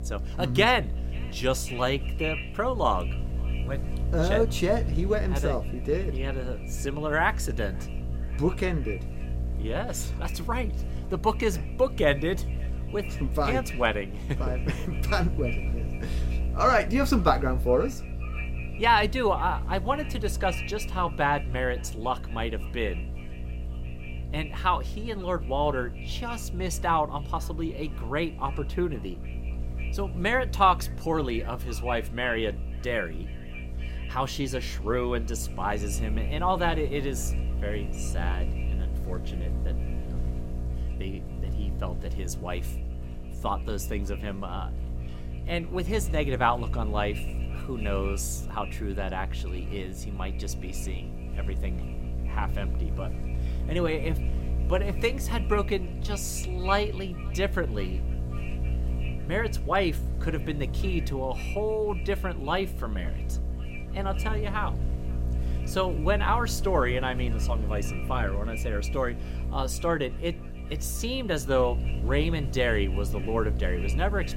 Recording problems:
echo of what is said; noticeable; throughout; 540 ms later, 20 dB below the speech
electrical hum; noticeable; throughout; 60 Hz, 15 dB below the speech

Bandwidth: 16 kHz